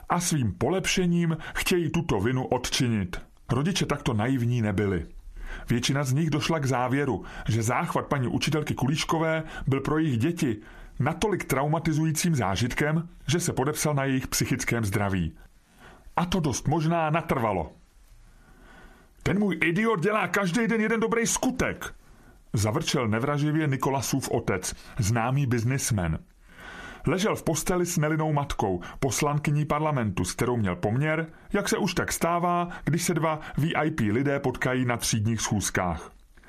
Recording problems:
squashed, flat; heavily

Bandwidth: 14.5 kHz